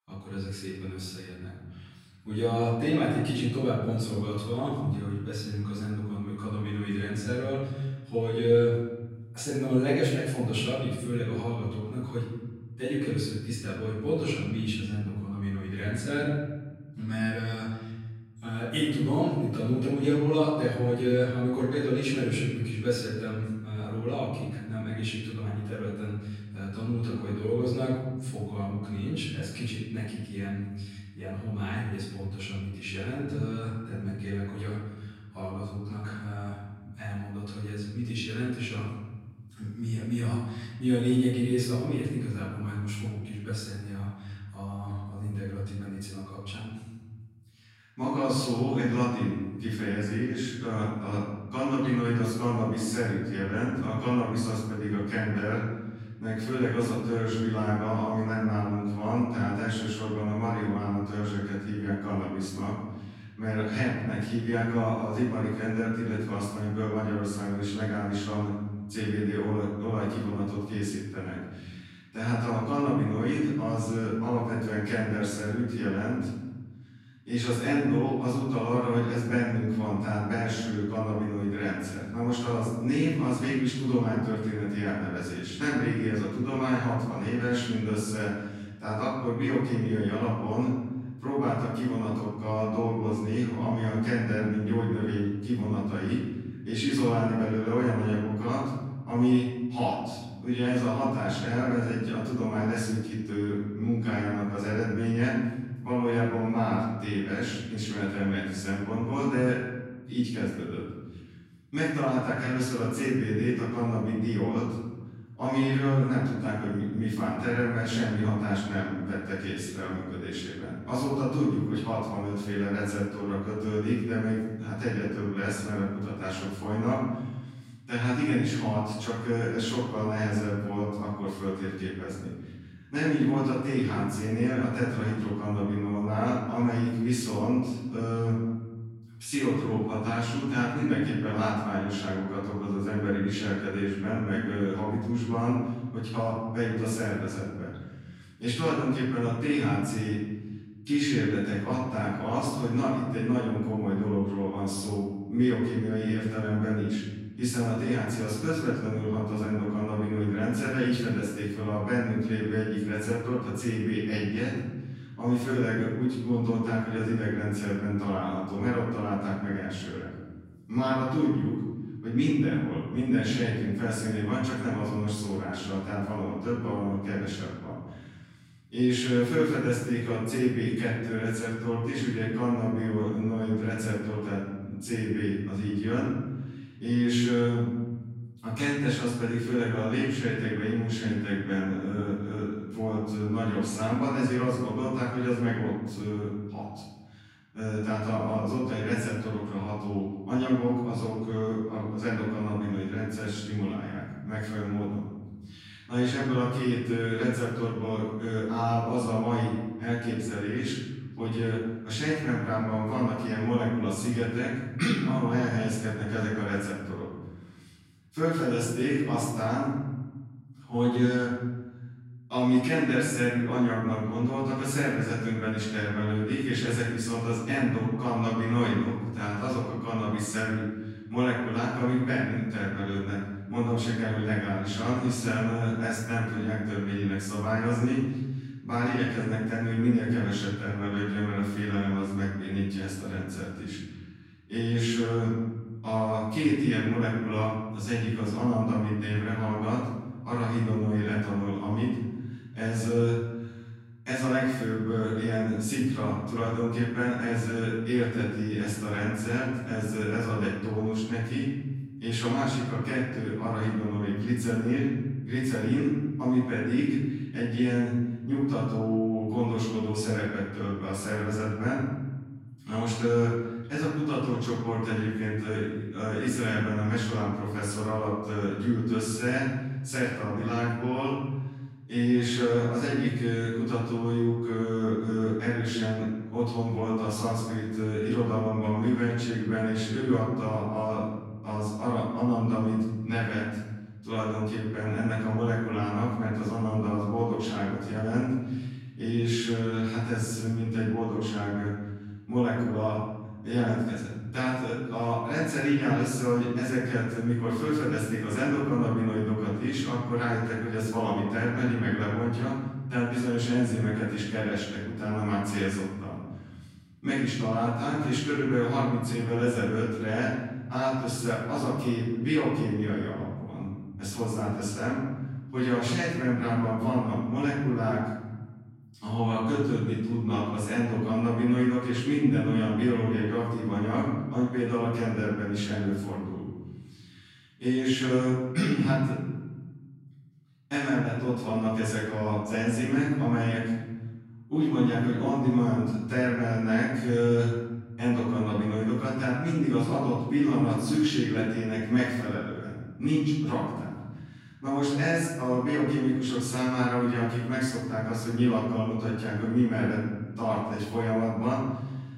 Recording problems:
room echo; strong; dies away in 1.6 s
off-mic speech; far

